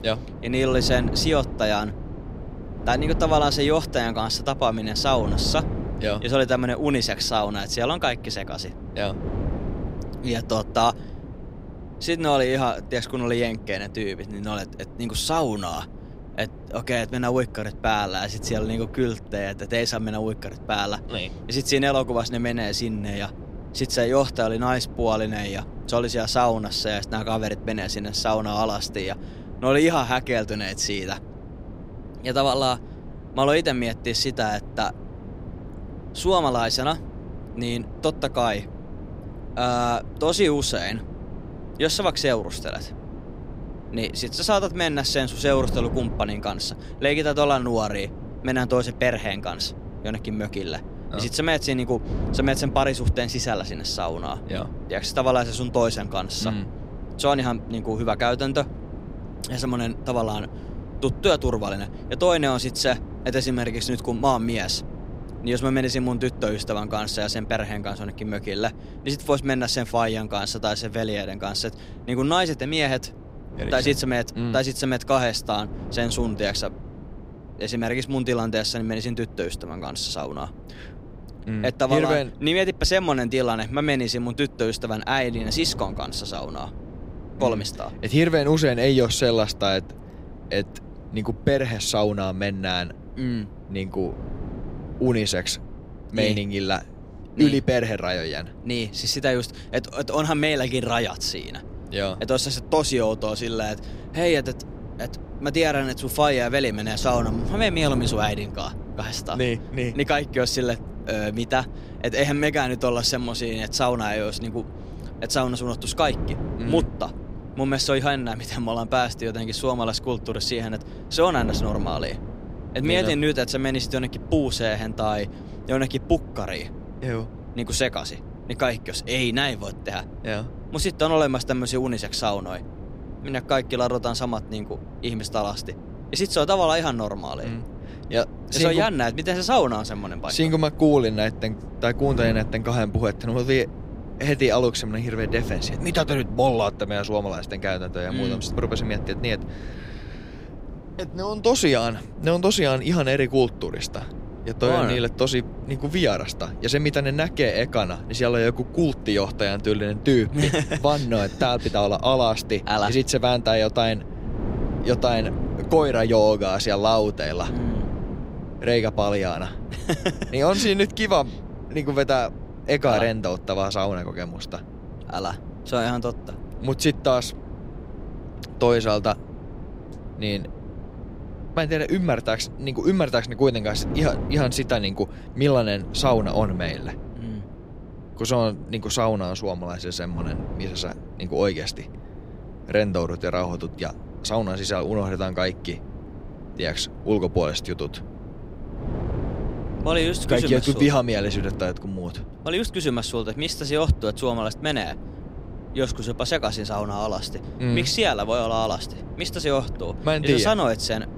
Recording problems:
wind noise on the microphone; occasional gusts; 20 dB below the speech

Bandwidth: 15.5 kHz